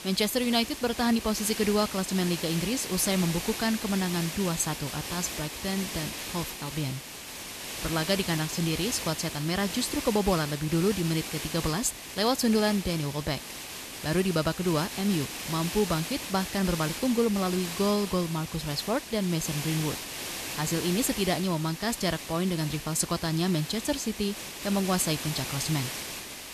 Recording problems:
hiss; loud; throughout; 7 dB below the speech

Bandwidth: 14 kHz